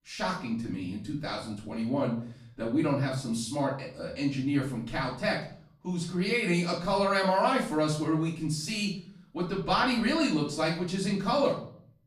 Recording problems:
off-mic speech; far
room echo; slight; dies away in 0.5 s

